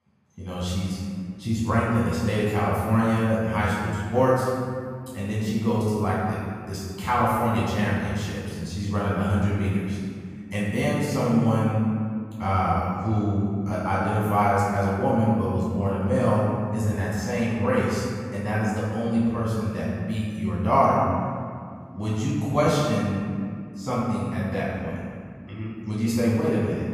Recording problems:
room echo; strong; dies away in 2.1 s
off-mic speech; far

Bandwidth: 15 kHz